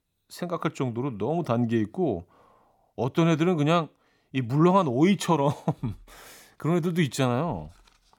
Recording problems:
none

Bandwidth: 18 kHz